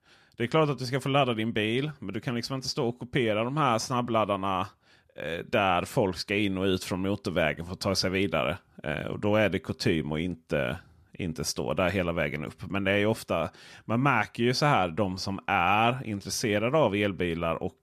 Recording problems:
none

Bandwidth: 14.5 kHz